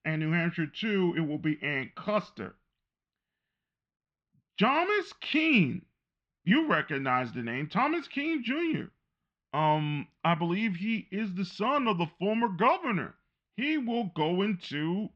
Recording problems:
muffled; very; fading above 3 kHz

